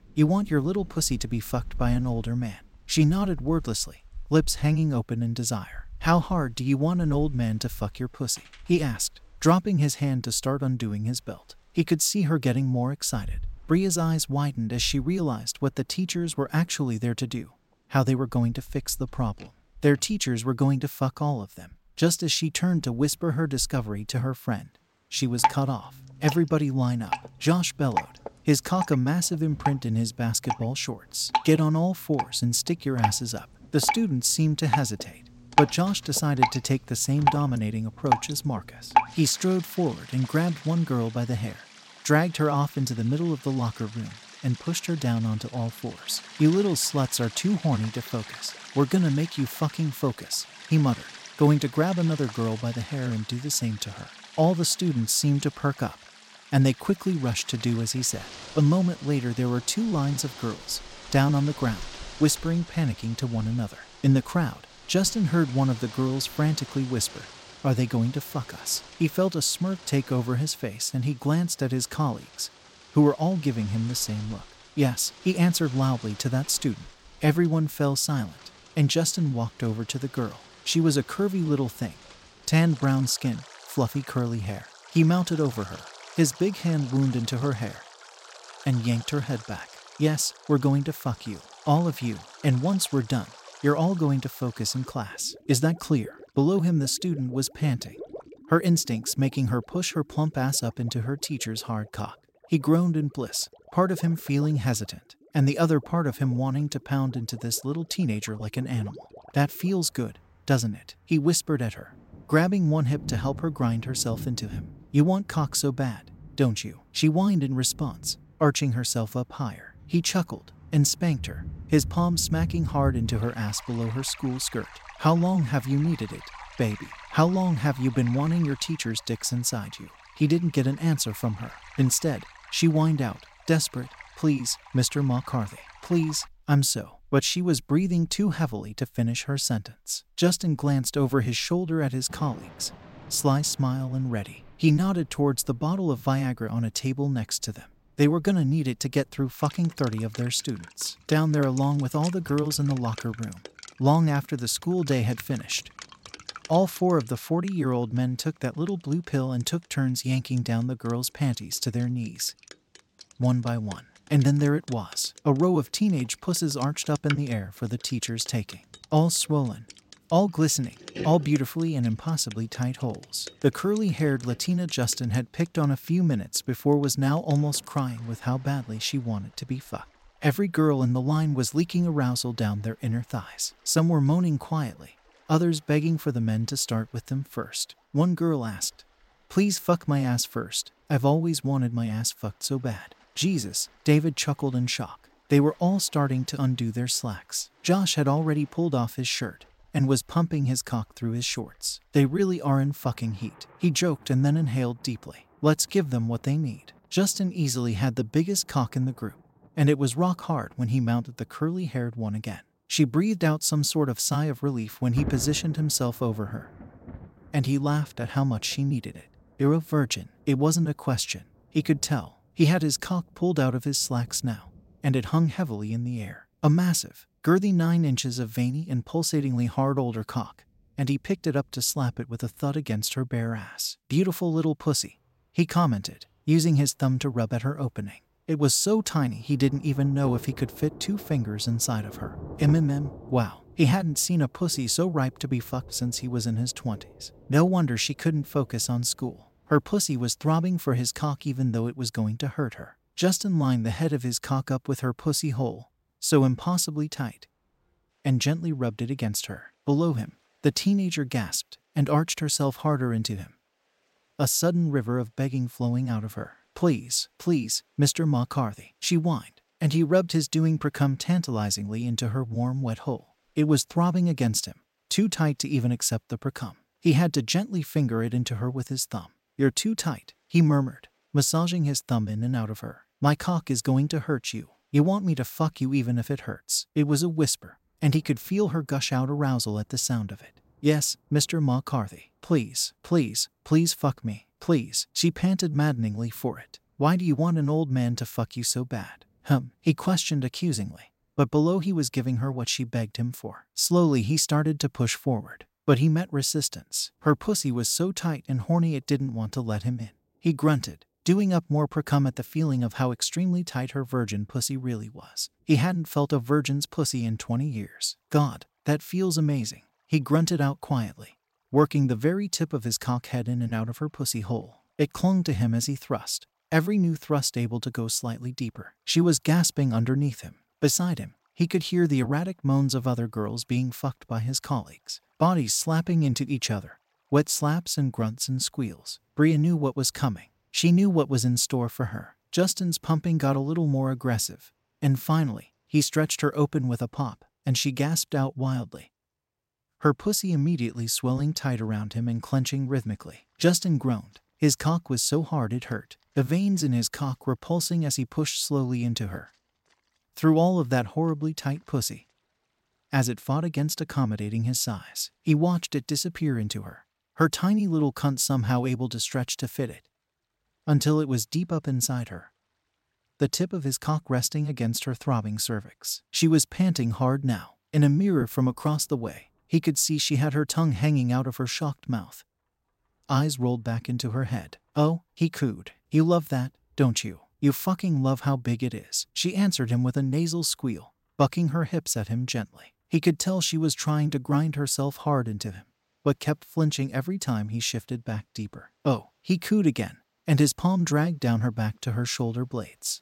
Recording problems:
rain or running water; noticeable; throughout; 15 dB below the speech

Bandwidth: 16 kHz